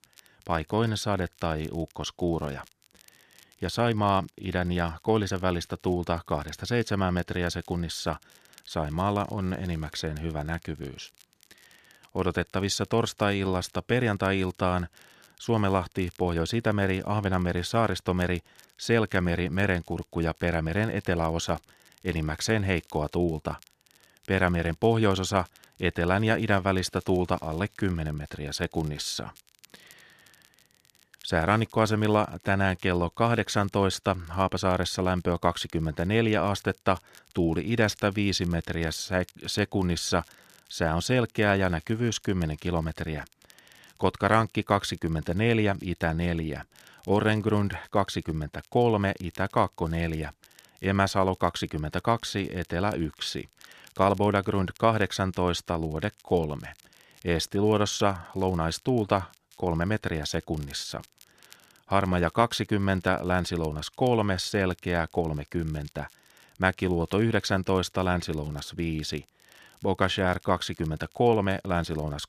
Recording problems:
crackle, like an old record; faint; 30 dB below the speech

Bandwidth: 14.5 kHz